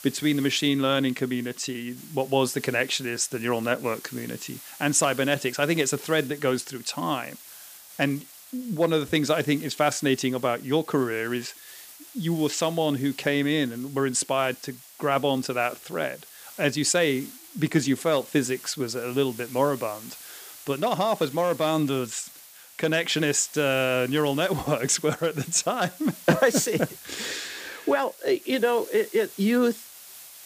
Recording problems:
hiss; noticeable; throughout; 20 dB below the speech

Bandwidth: 15 kHz